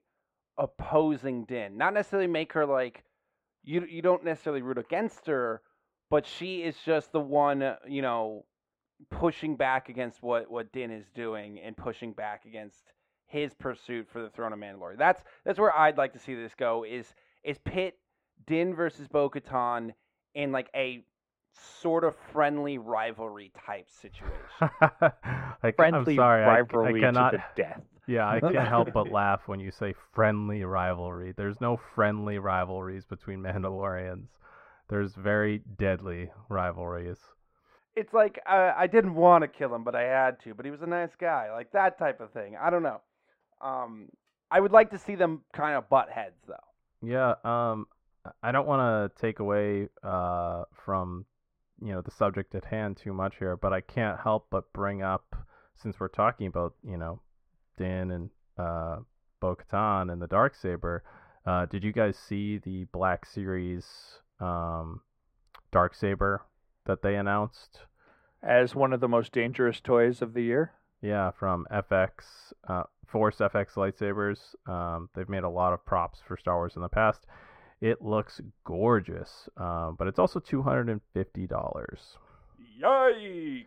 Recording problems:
muffled; very; fading above 3.5 kHz

